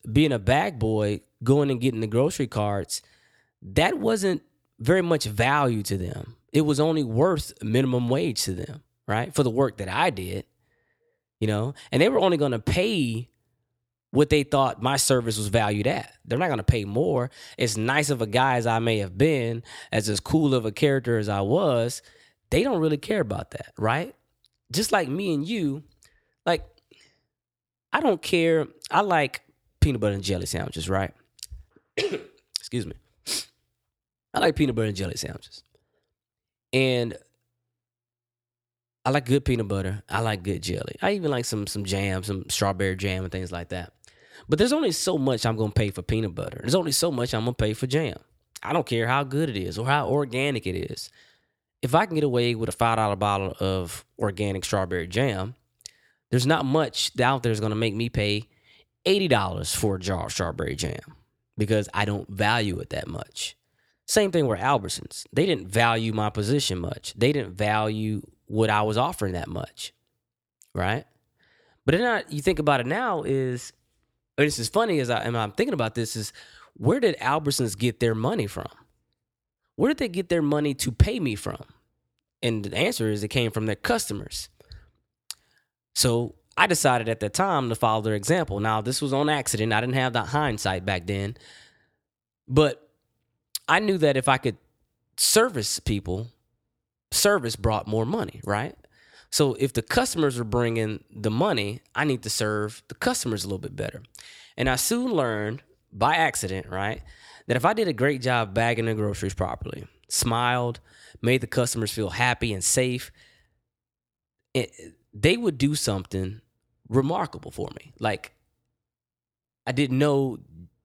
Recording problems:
none

